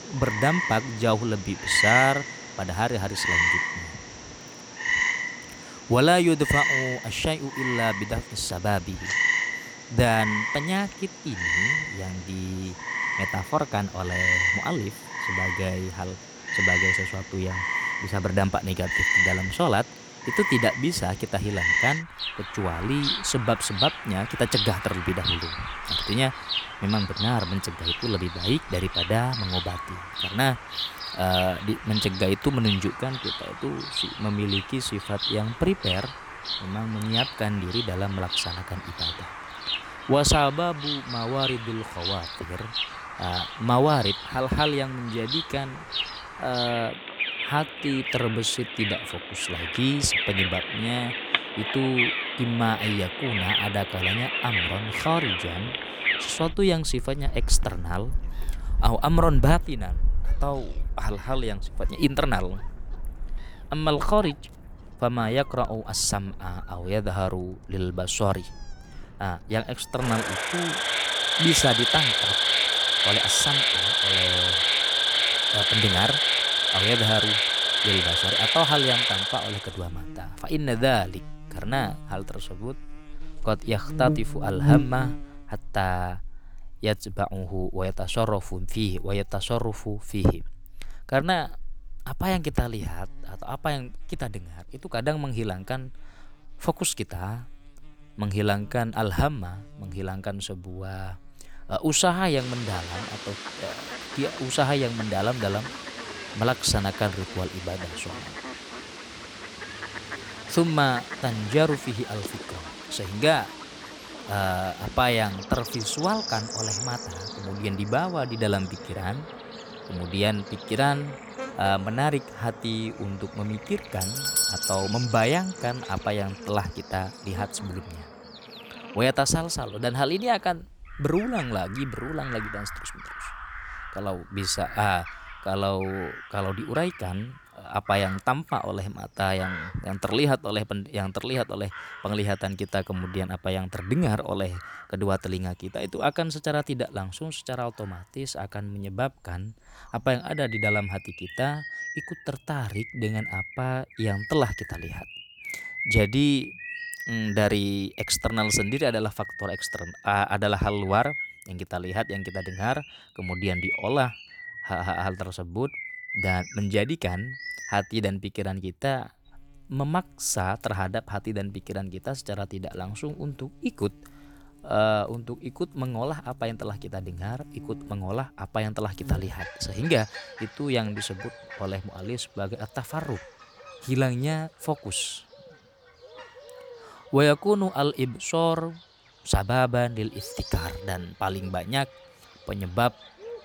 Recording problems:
animal sounds; very loud; throughout; as loud as the speech
doorbell; loud; at 2:04; peak 5 dB above the speech

